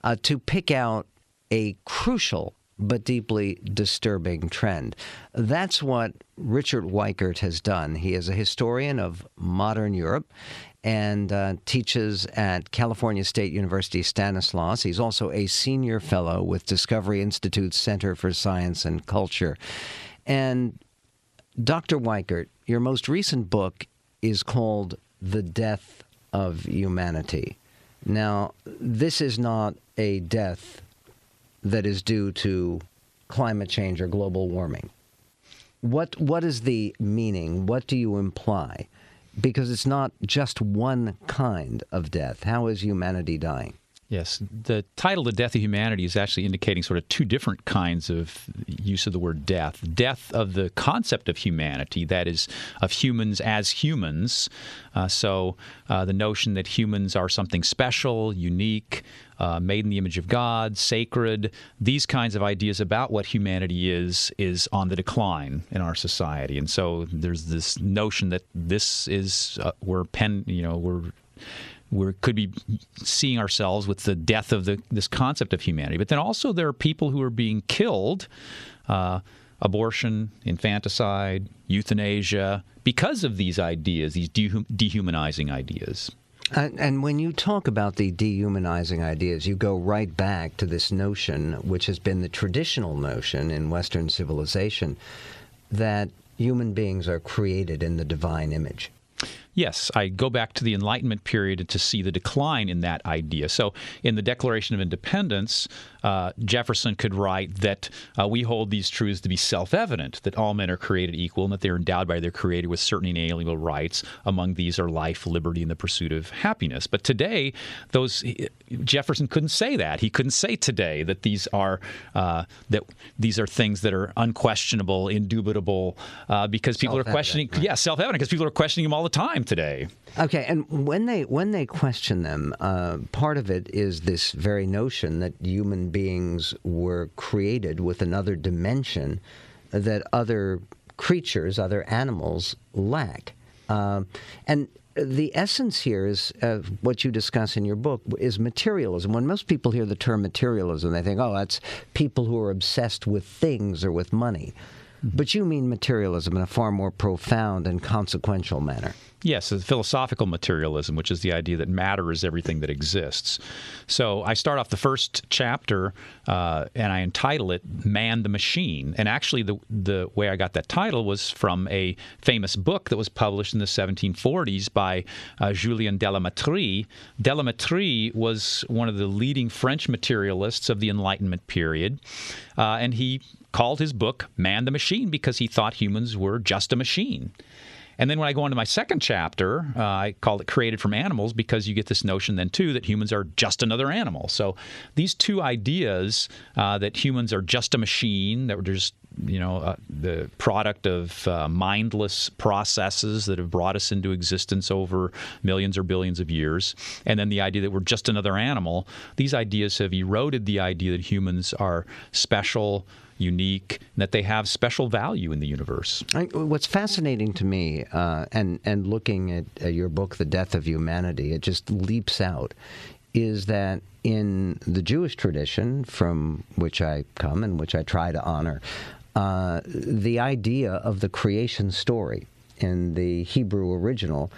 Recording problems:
squashed, flat; heavily

